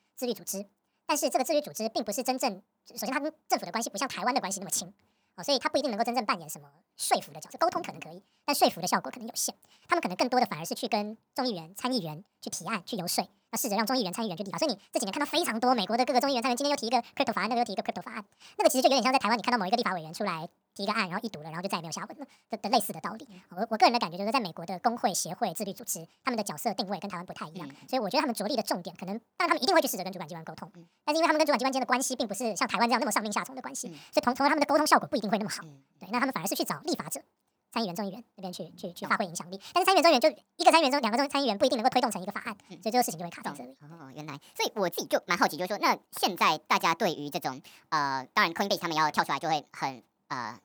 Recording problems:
wrong speed and pitch; too fast and too high; 1.6 times normal speed

